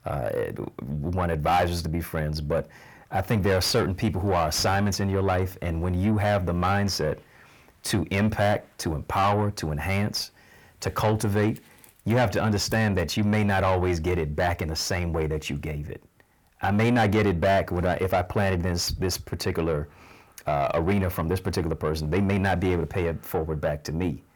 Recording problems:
distortion; heavy; 8 dB below the speech

